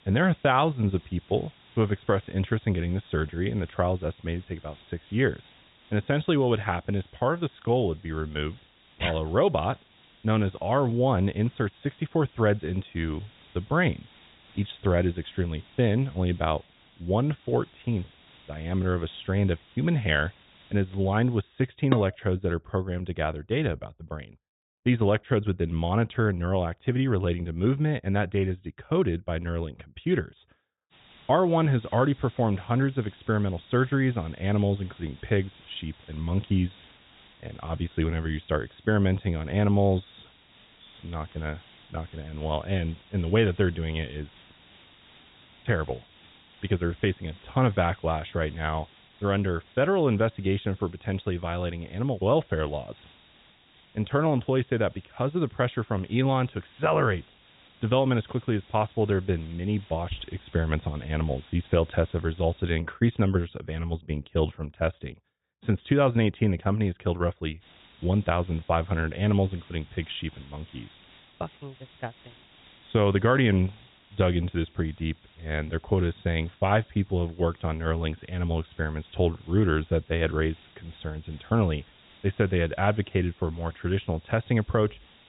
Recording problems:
high frequencies cut off; severe; nothing above 4 kHz
hiss; faint; until 21 s, from 31 s to 1:03 and from 1:08 on; 25 dB below the speech
clattering dishes; very faint; at 22 s; peak 4 dB below the speech

